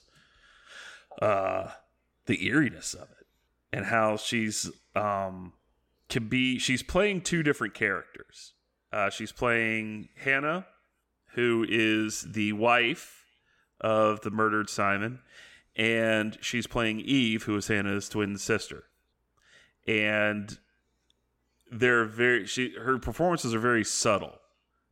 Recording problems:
none

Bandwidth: 16.5 kHz